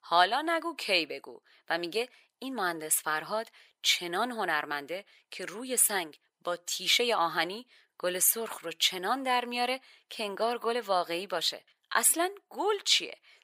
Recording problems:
thin; very; fading below 650 Hz

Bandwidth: 15.5 kHz